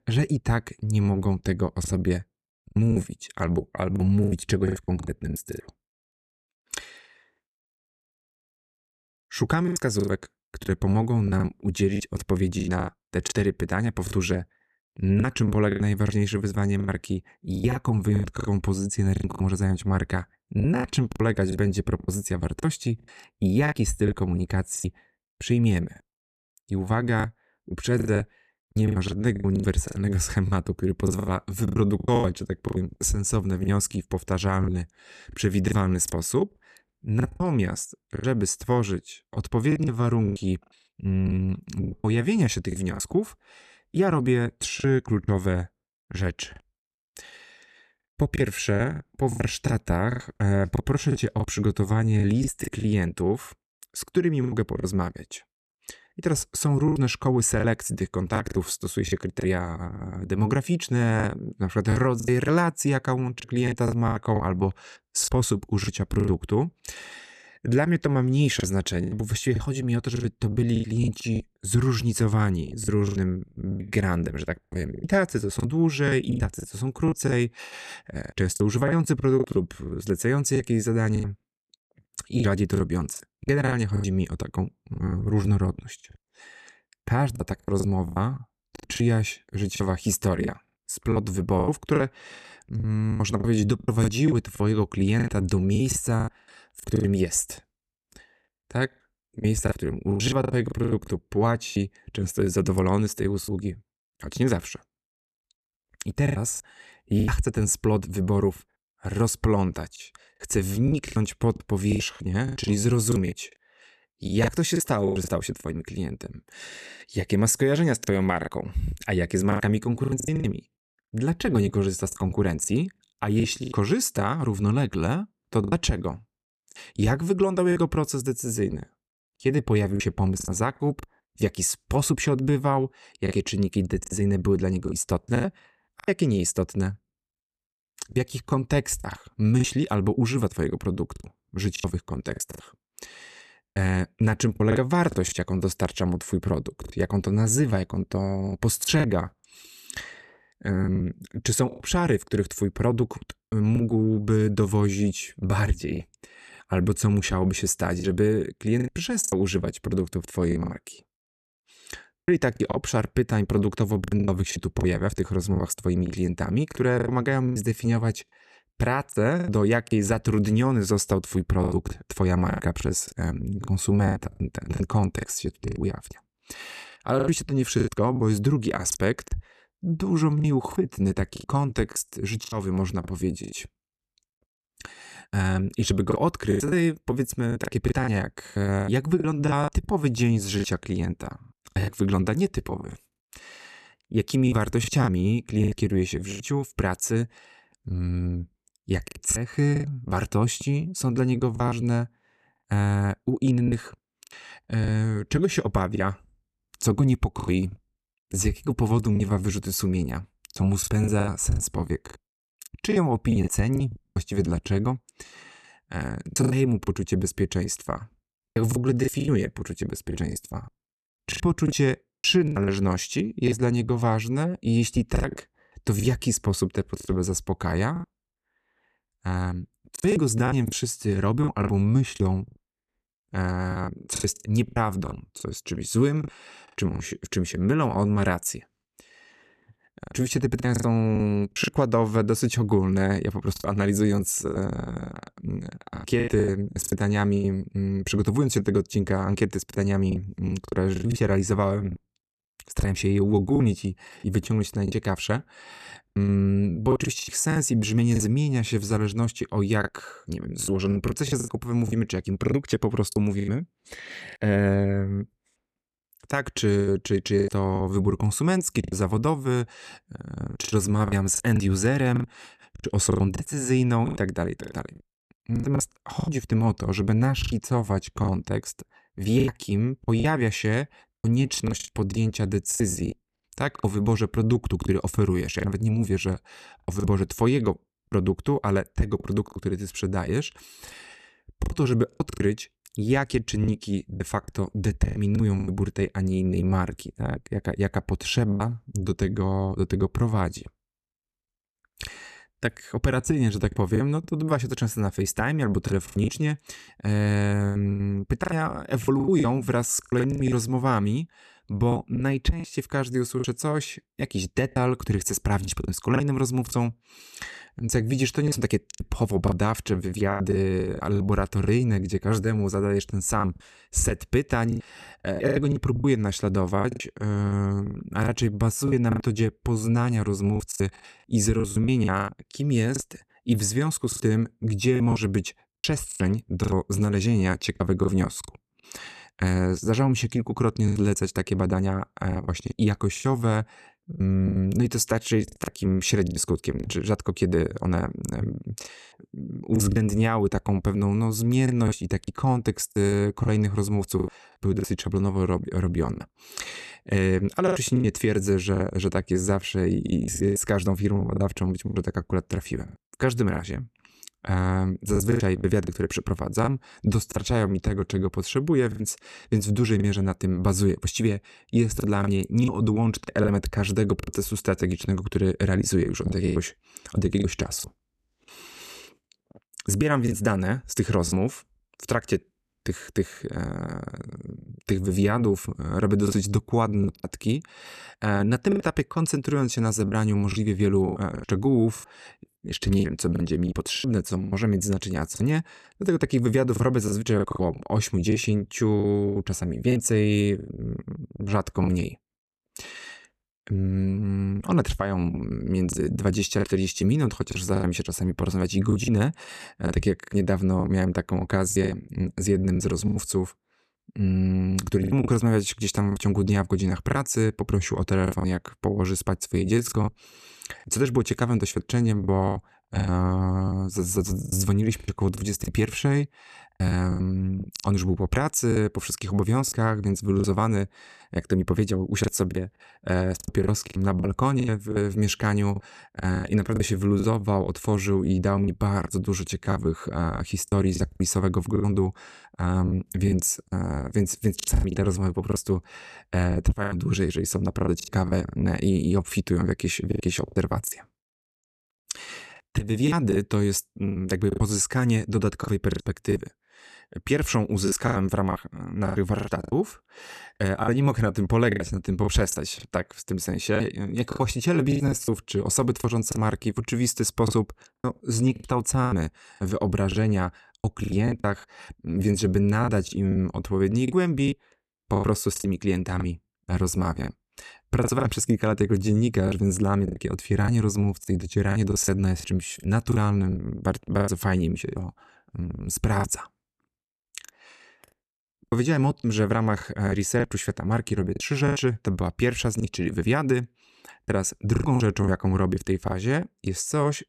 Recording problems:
choppy; very; 10% of the speech affected

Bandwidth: 13.5 kHz